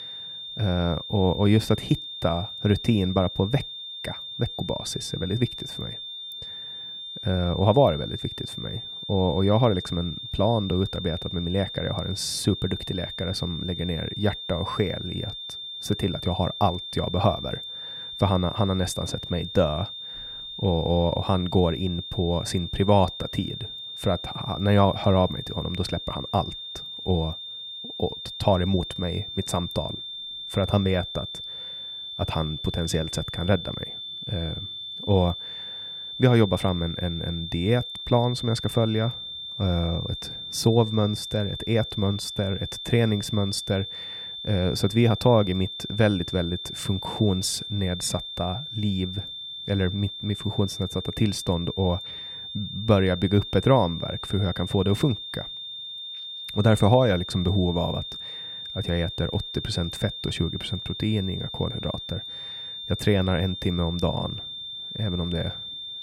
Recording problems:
high-pitched whine; loud; throughout; 3.5 kHz, 8 dB below the speech

